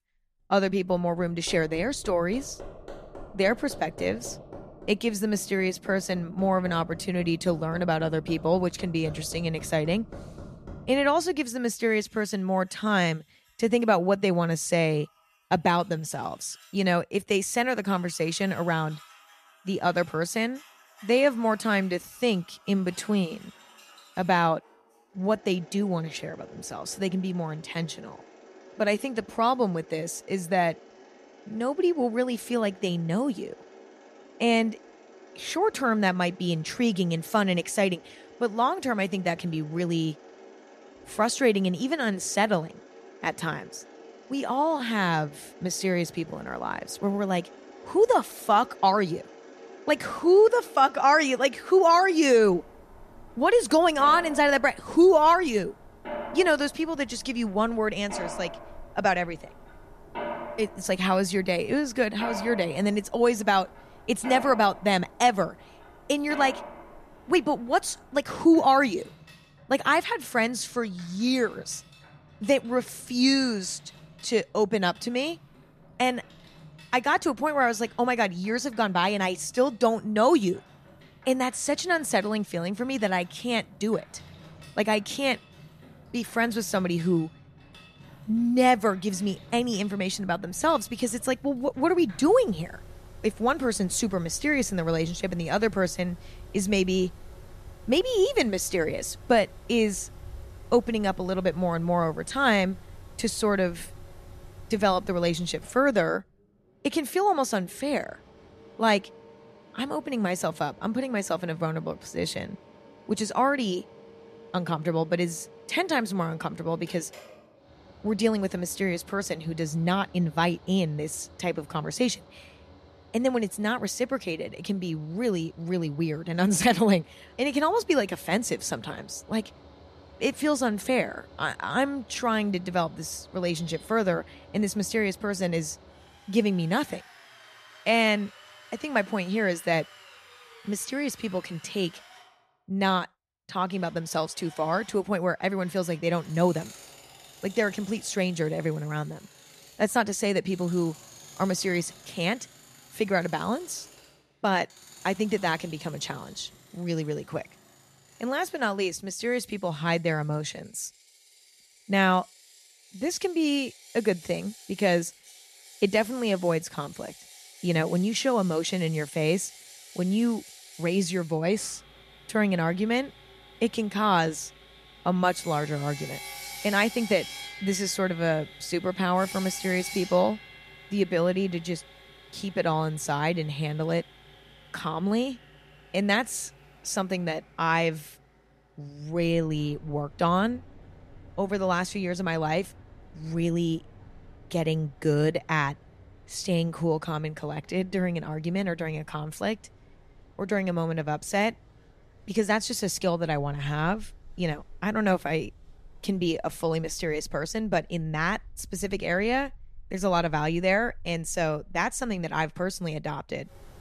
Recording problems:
machinery noise; faint; throughout; 20 dB below the speech

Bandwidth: 14.5 kHz